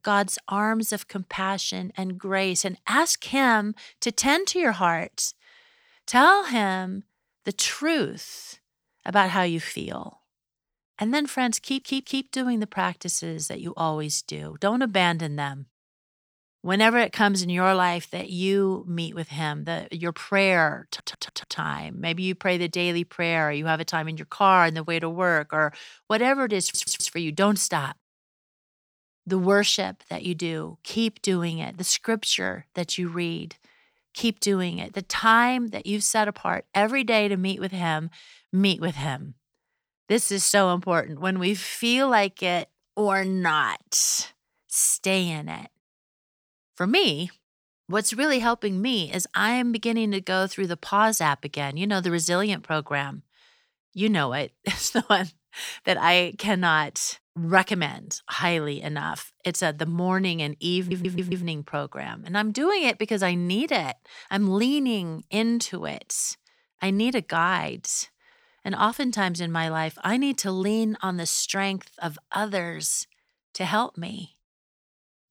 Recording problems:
audio stuttering; 4 times, first at 12 s

